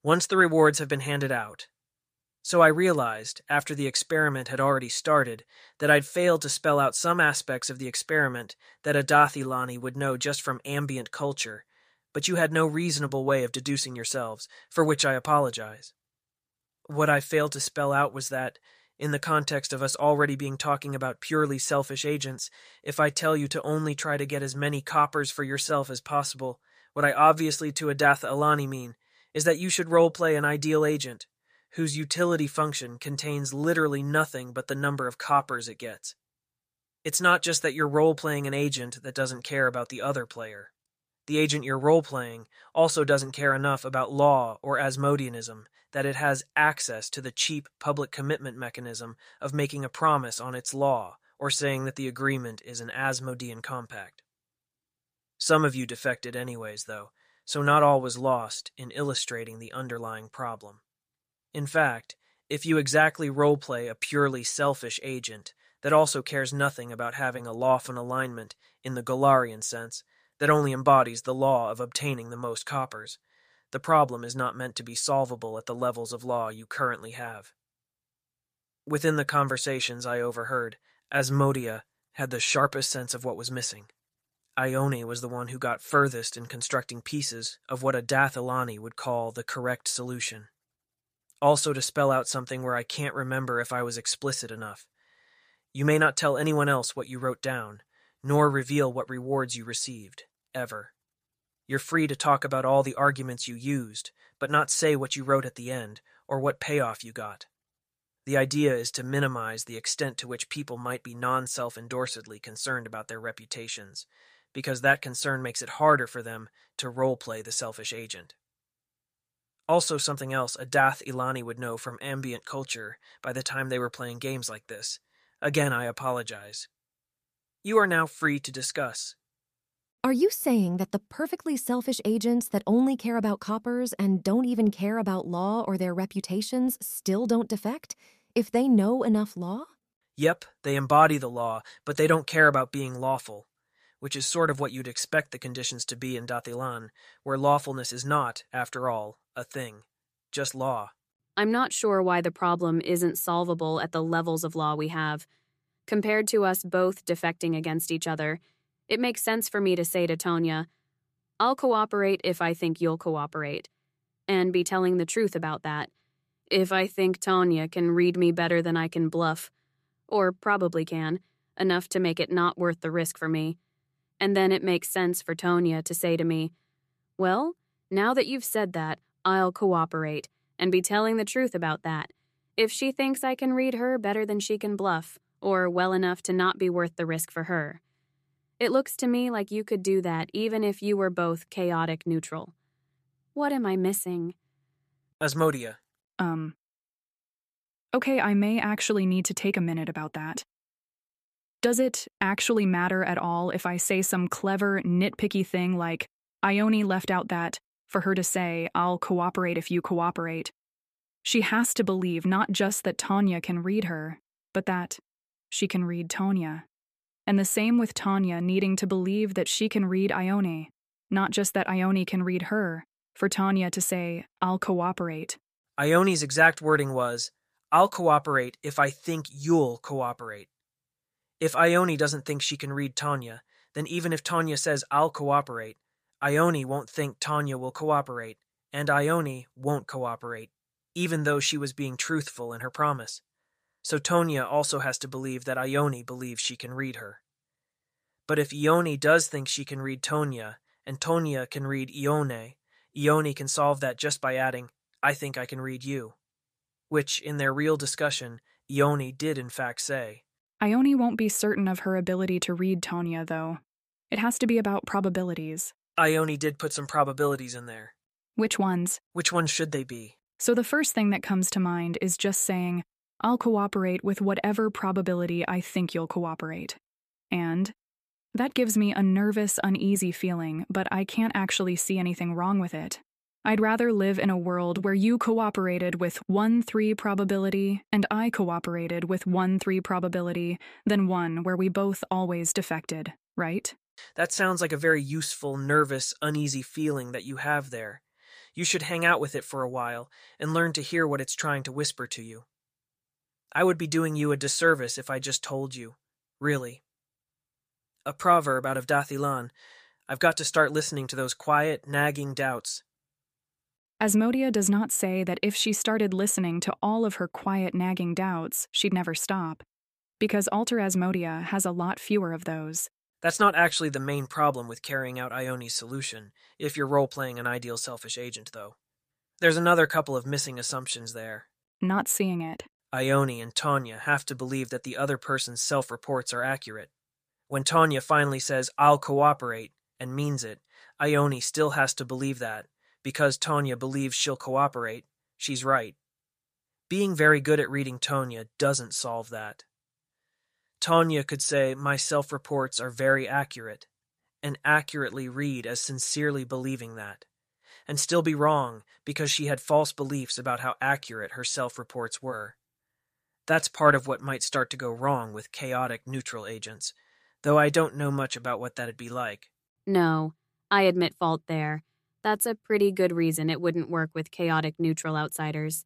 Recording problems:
none

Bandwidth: 14.5 kHz